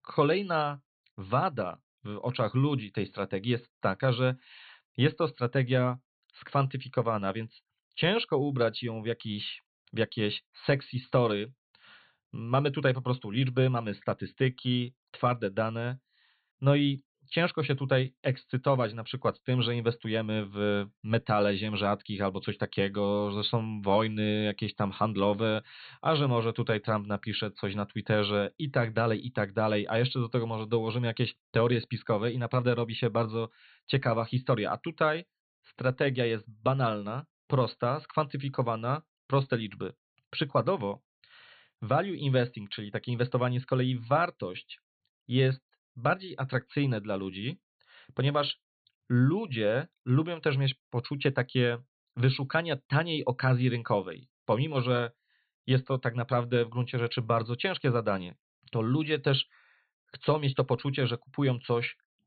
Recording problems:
high frequencies cut off; severe; nothing above 4.5 kHz

